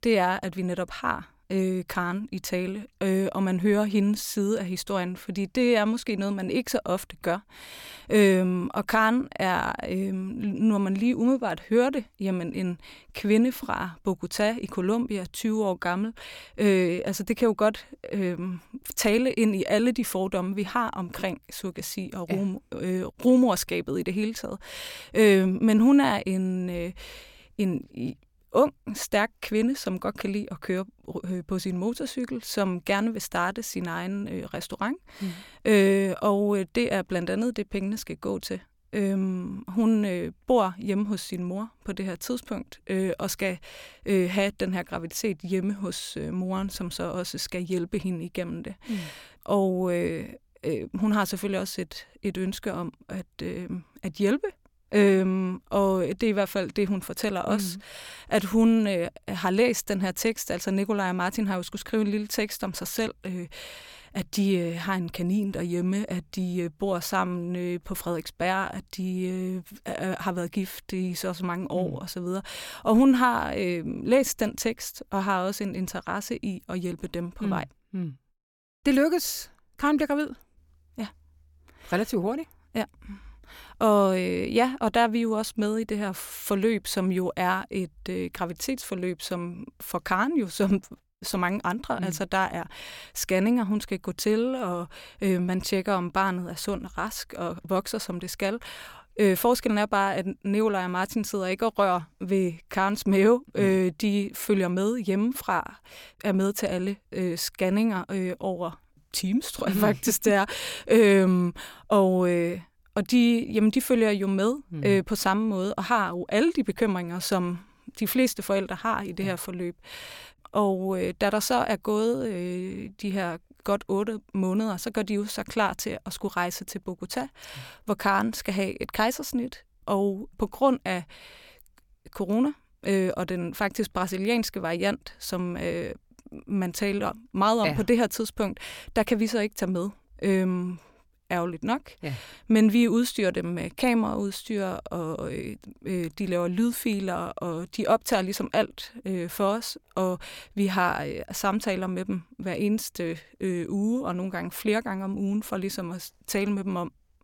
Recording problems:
none

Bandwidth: 17 kHz